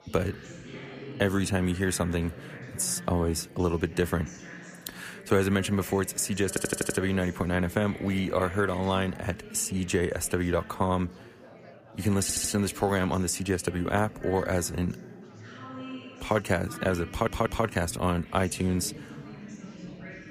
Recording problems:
chatter from many people; noticeable; throughout; 15 dB below the speech
audio stuttering; at 6.5 s, at 12 s and at 17 s

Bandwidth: 15 kHz